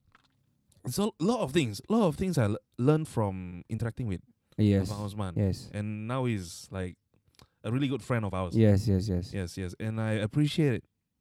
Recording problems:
uneven, jittery; strongly; from 0.5 to 11 s

